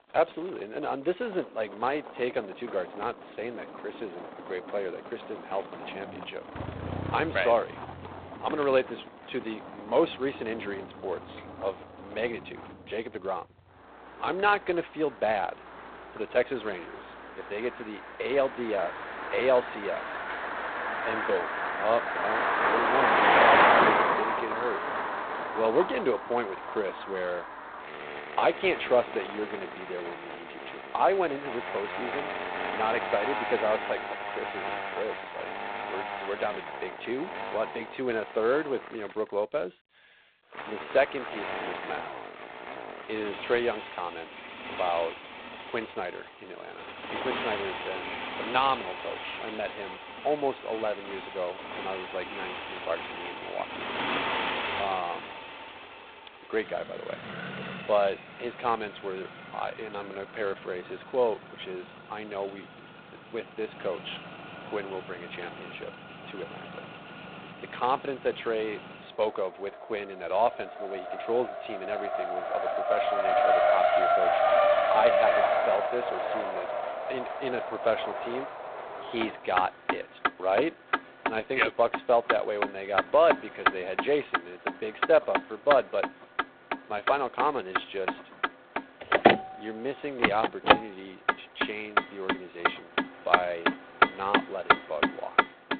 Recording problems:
phone-call audio; poor line; nothing above 4 kHz
traffic noise; very loud; throughout; 1 dB above the speech

